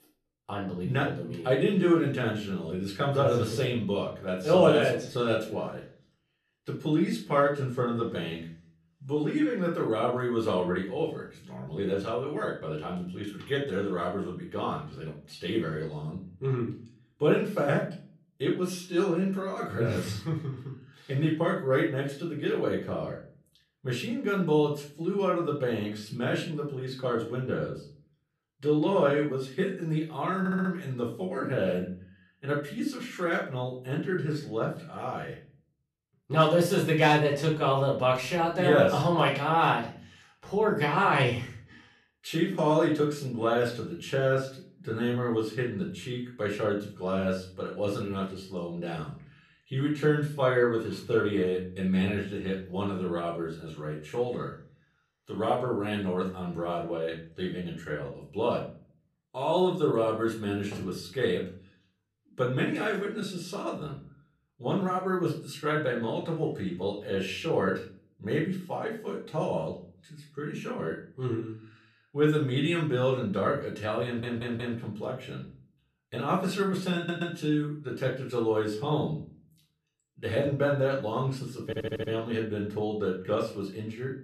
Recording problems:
off-mic speech; far
room echo; slight; dies away in 0.4 s
audio stuttering; 4 times, first at 30 s

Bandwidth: 13.5 kHz